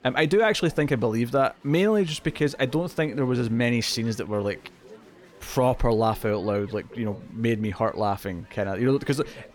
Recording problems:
chatter from many people; faint; throughout; 25 dB below the speech

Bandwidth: 18 kHz